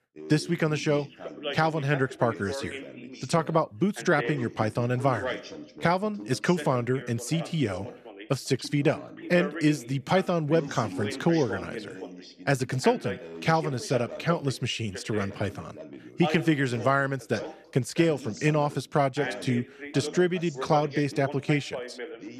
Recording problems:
background chatter; noticeable; throughout; 2 voices, 10 dB below the speech

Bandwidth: 13.5 kHz